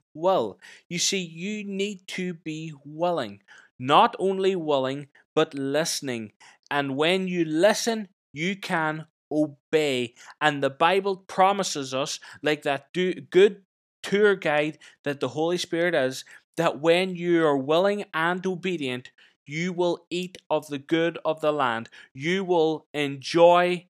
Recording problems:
none

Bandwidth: 15 kHz